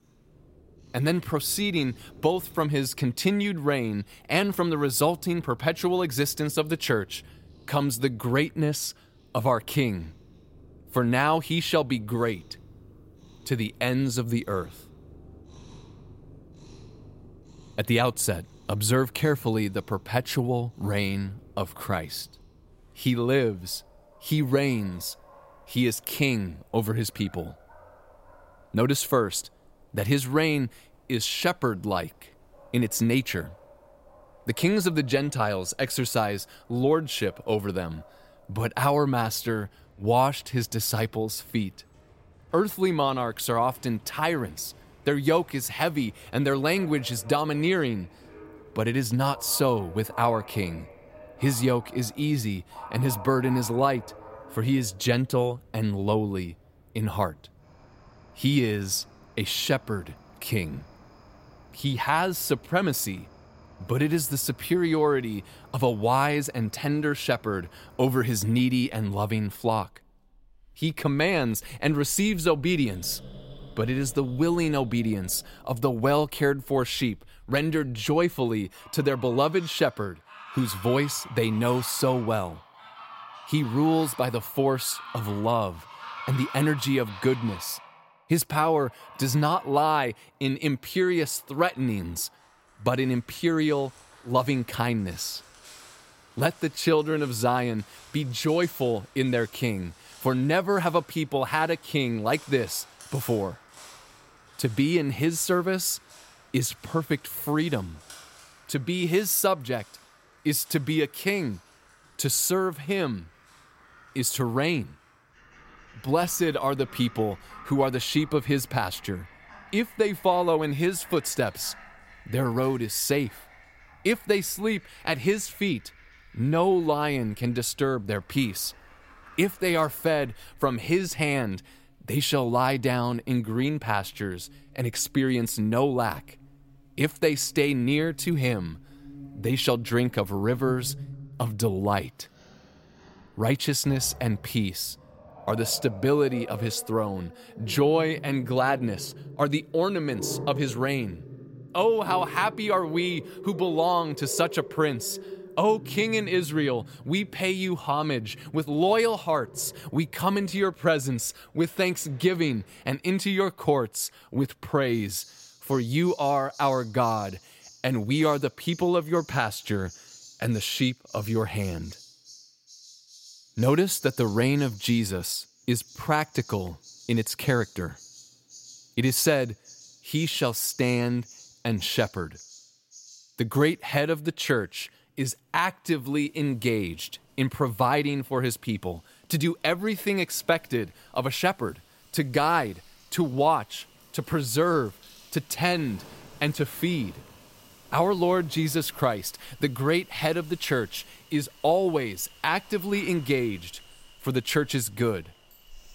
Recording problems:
animal sounds; faint; throughout; 20 dB below the speech

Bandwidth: 16 kHz